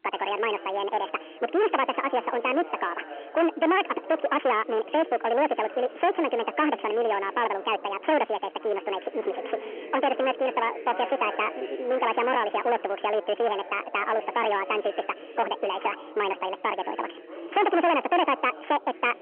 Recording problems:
distortion; heavy; 12% of the sound clipped
wrong speed and pitch; too fast and too high; 1.7 times normal speed
phone-call audio; nothing above 3 kHz
background chatter; noticeable; throughout; 4 voices, 15 dB below the speech

